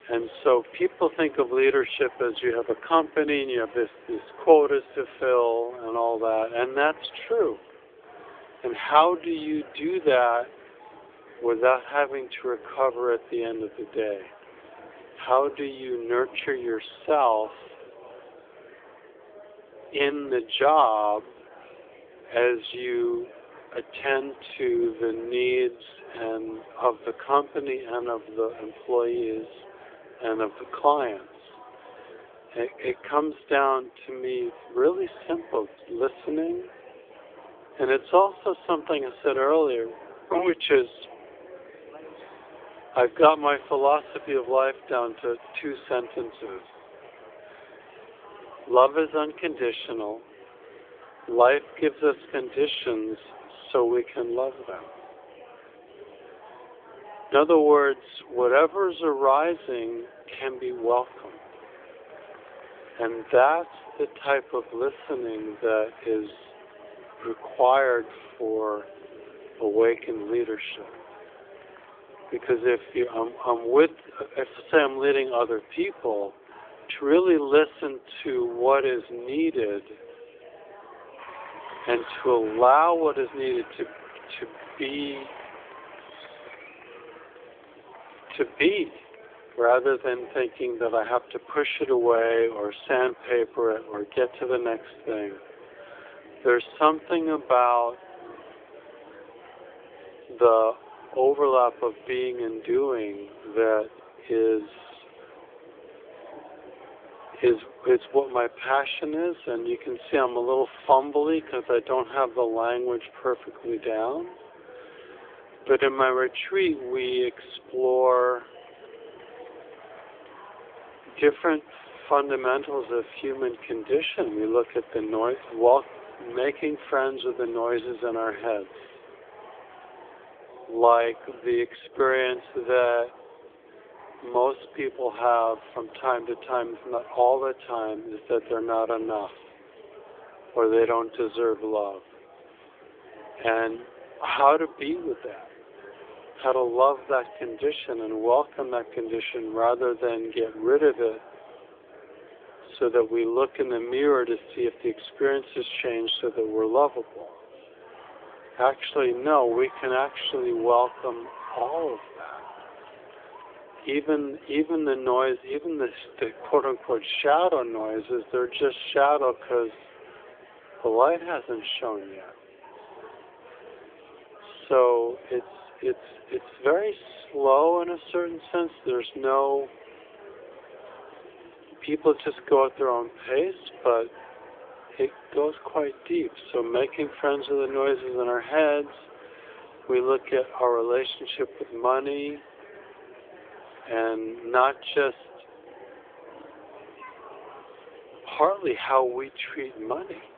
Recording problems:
wrong speed, natural pitch; too slow; 0.7 times normal speed
phone-call audio; nothing above 3.5 kHz
murmuring crowd; faint; throughout; 20 dB below the speech

